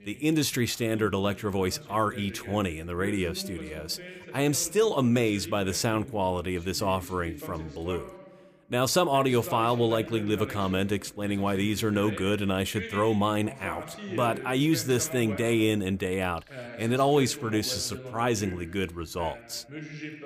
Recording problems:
voice in the background; noticeable; throughout; 15 dB below the speech

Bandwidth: 15 kHz